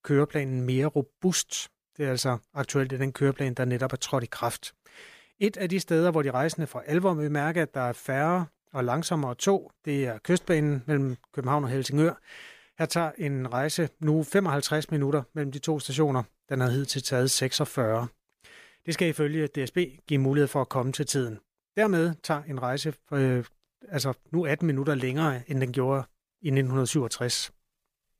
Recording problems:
none

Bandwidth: 15 kHz